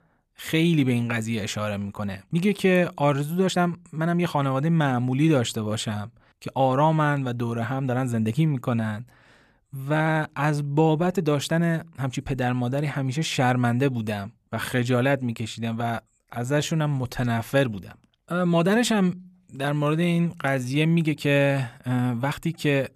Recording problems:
uneven, jittery; strongly; from 2 to 22 s

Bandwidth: 14.5 kHz